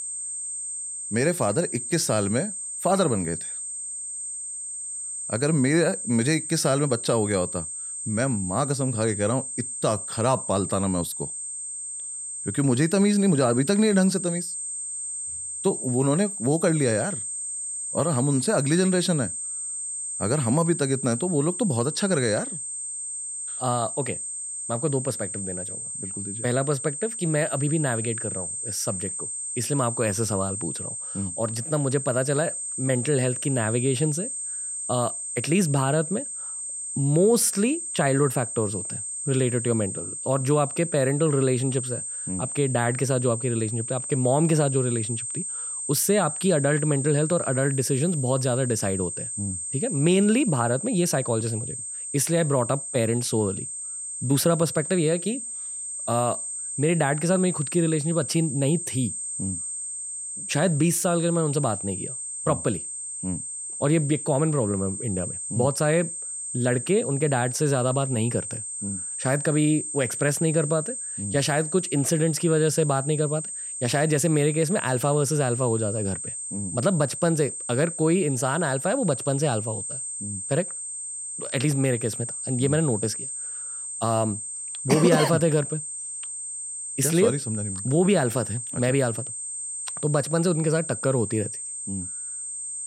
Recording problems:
high-pitched whine; loud; throughout; 8.5 kHz, 5 dB below the speech

